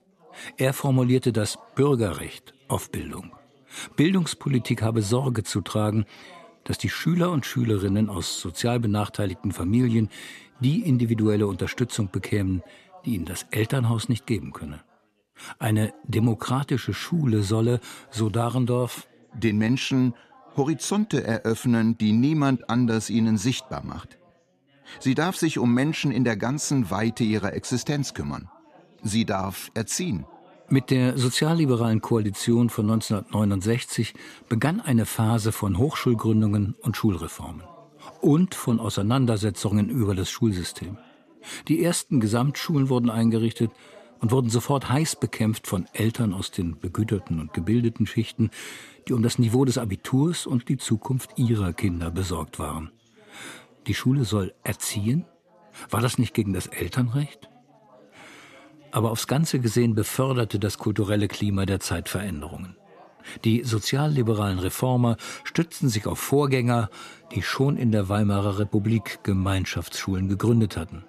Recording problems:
background chatter; faint; throughout; 4 voices, 30 dB below the speech

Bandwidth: 14 kHz